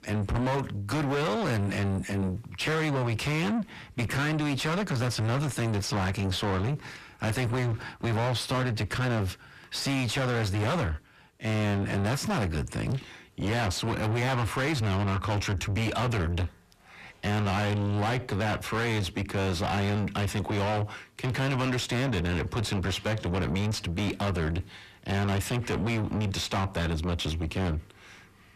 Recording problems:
distortion; heavy; 6 dB below the speech

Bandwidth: 14.5 kHz